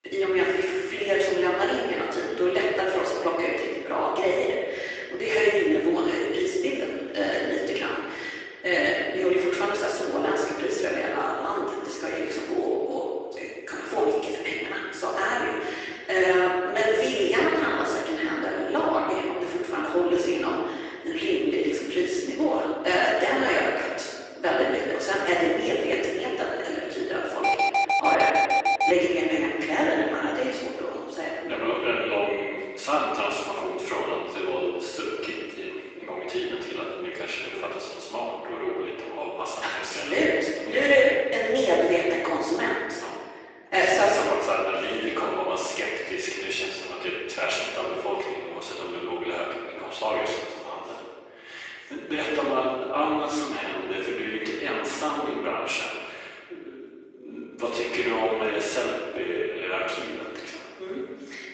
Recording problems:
room echo; strong; dies away in 1.7 s
off-mic speech; far
thin; very; fading below 350 Hz
garbled, watery; slightly; nothing above 8 kHz
alarm; loud; from 27 to 29 s; peak 5 dB above the speech

